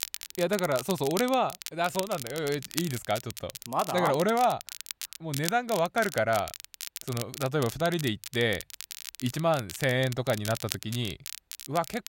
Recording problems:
crackle, like an old record; loud; 10 dB below the speech

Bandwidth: 16 kHz